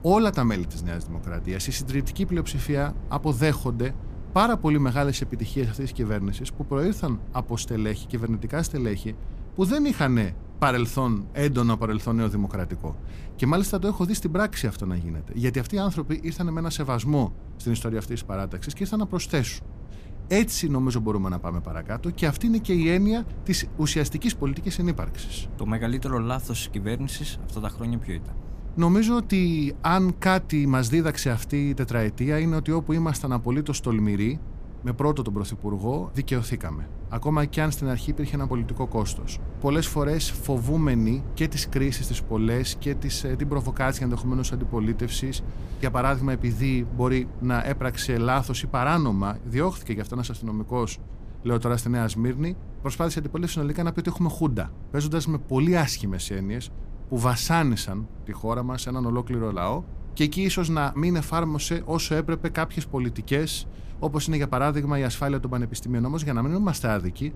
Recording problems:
low rumble; faint; throughout; 20 dB below the speech

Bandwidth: 15 kHz